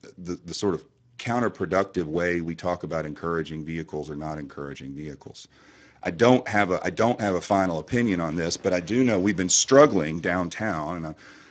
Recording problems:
garbled, watery; badly; nothing above 6.5 kHz

